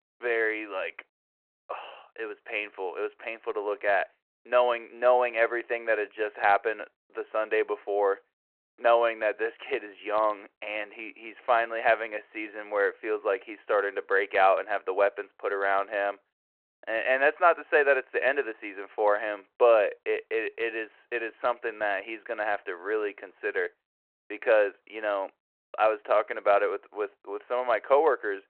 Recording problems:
phone-call audio

